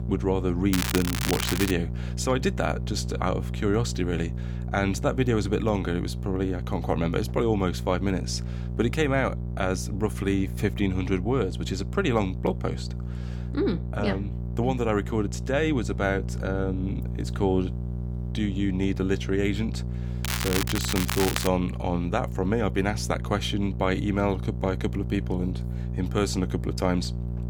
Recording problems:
crackling; loud; from 0.5 to 1.5 s and from 20 to 21 s; 2 dB below the speech
electrical hum; noticeable; throughout; 60 Hz, 15 dB below the speech

